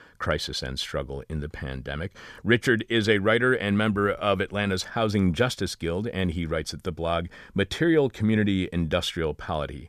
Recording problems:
none

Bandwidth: 14.5 kHz